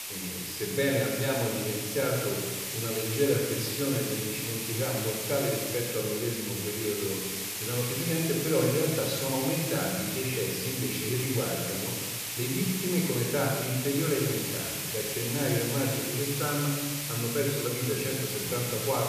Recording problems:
room echo; noticeable; dies away in 1.4 s
off-mic speech; somewhat distant
hiss; loud; throughout; 2 dB below the speech

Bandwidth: 14.5 kHz